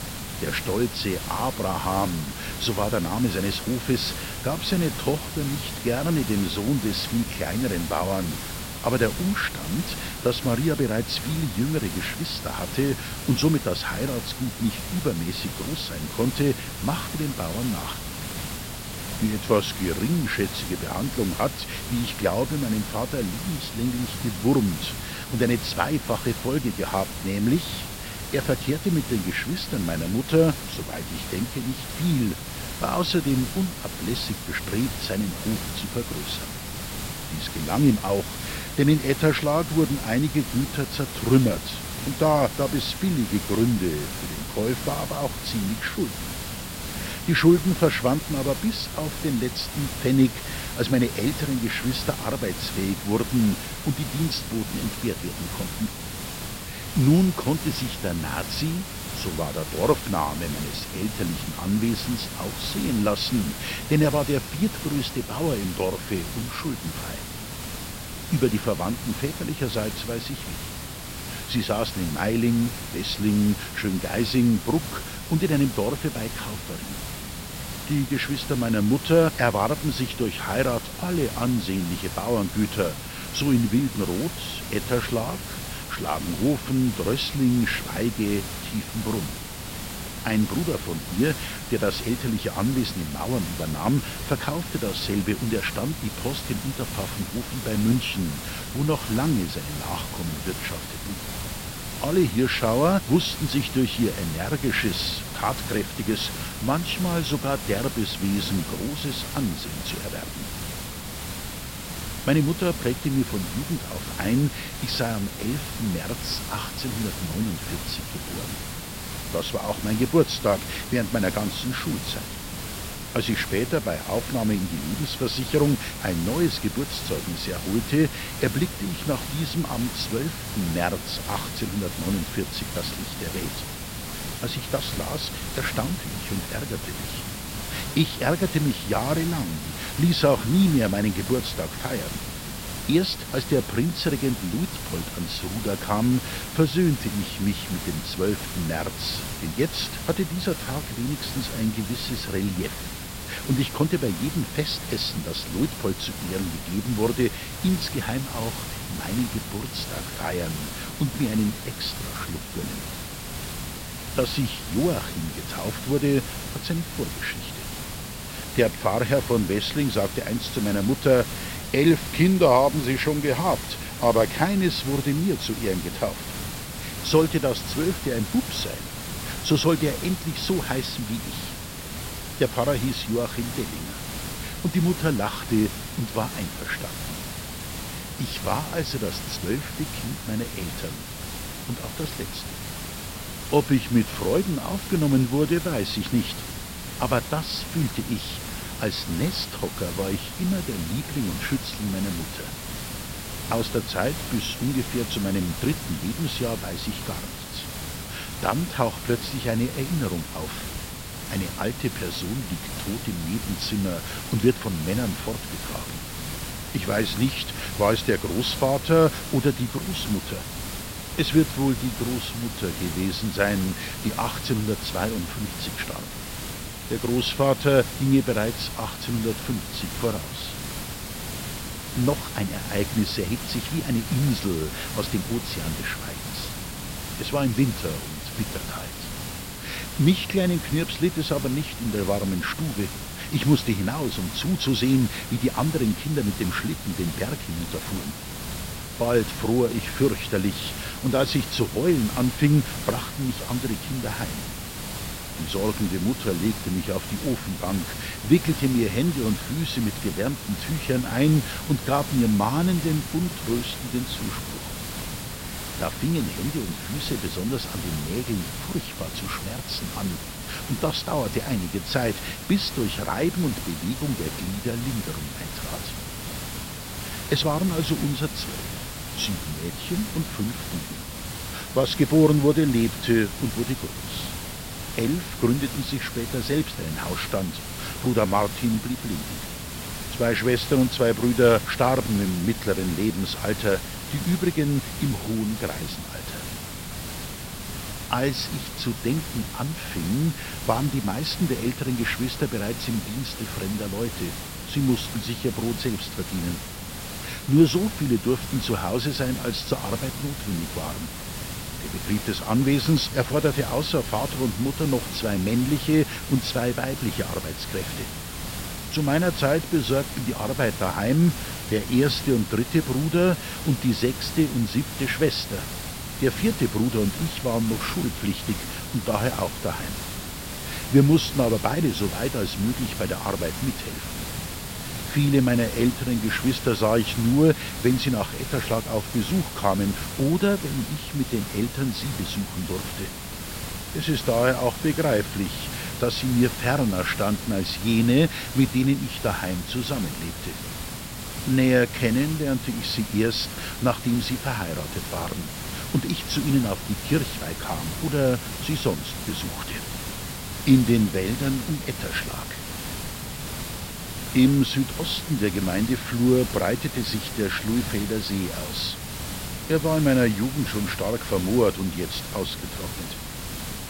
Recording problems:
high frequencies cut off; noticeable; nothing above 5.5 kHz
hiss; loud; throughout; 7 dB below the speech

